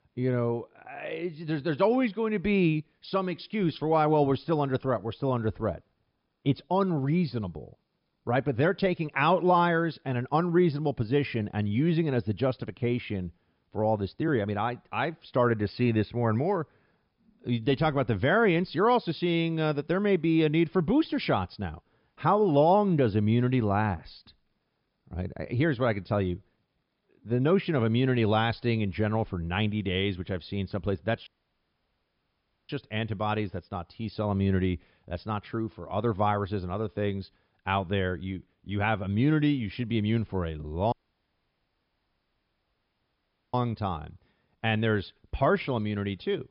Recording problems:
high frequencies cut off; noticeable; nothing above 5.5 kHz
audio cutting out; at 31 s for 1.5 s and at 41 s for 2.5 s

